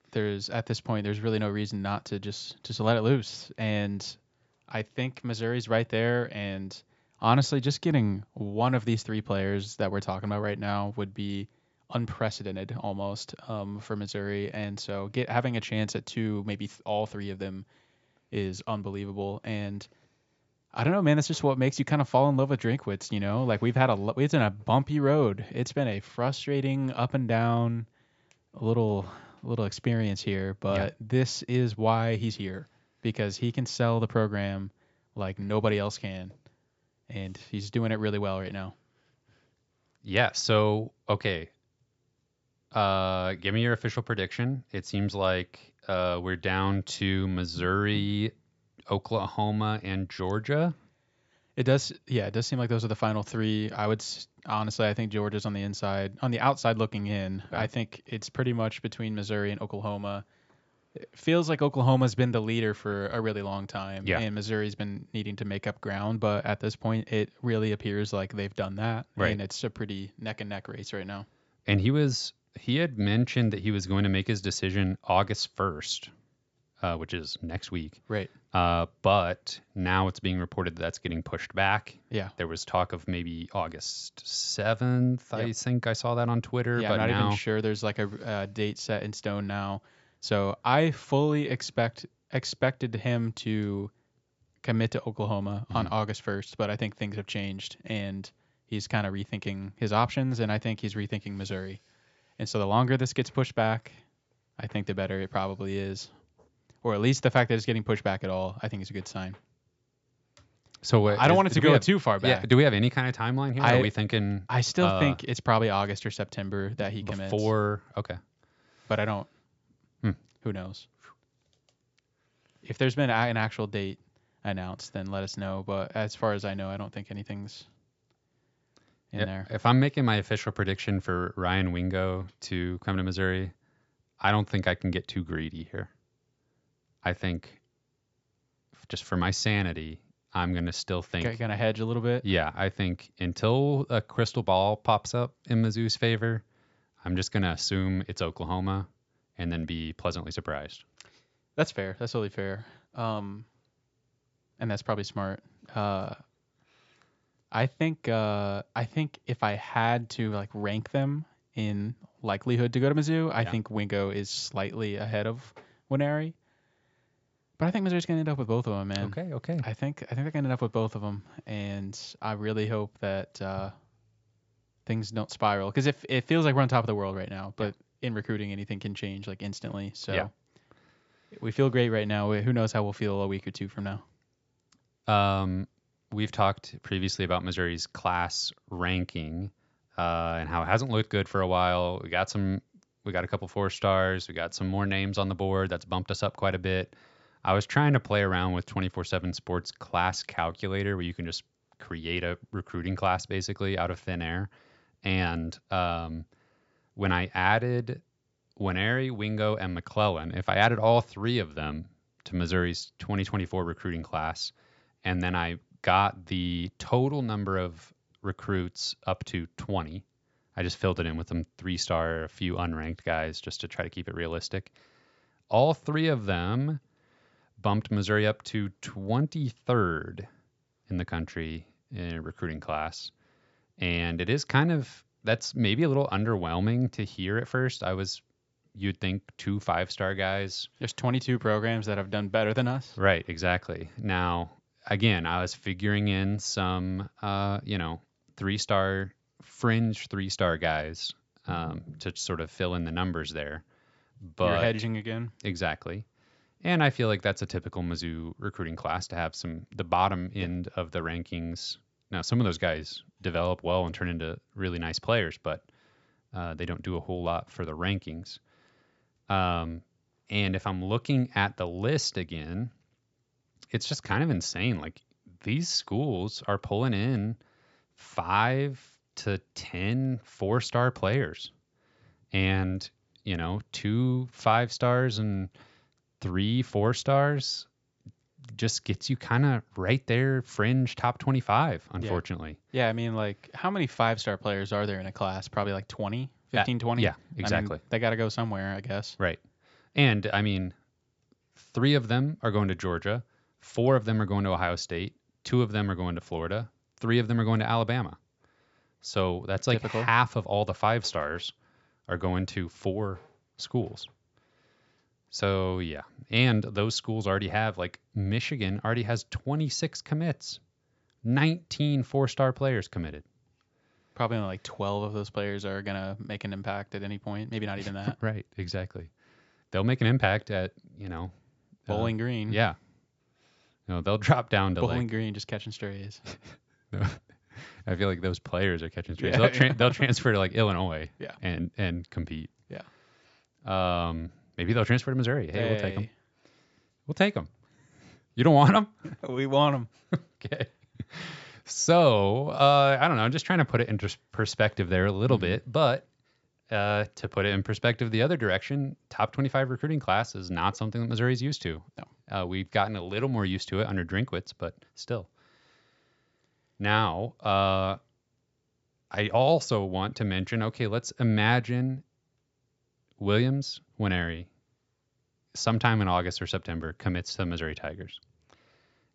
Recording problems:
high frequencies cut off; noticeable; nothing above 8 kHz

